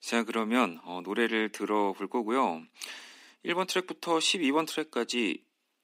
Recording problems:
thin; somewhat; fading below 250 Hz

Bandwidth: 15.5 kHz